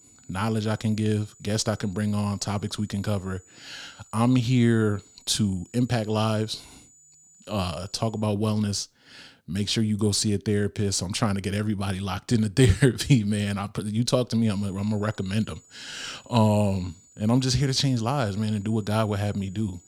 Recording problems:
high-pitched whine; faint; until 8 s and from 14 s on; 7 kHz, 25 dB below the speech

